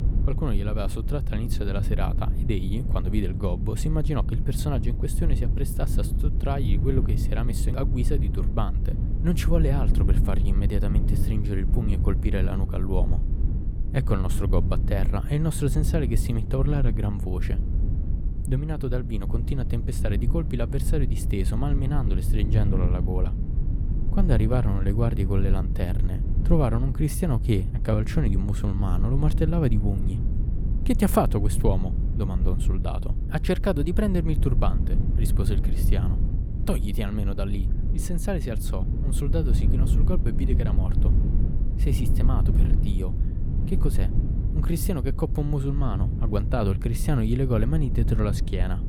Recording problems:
low rumble; loud; throughout; 8 dB below the speech

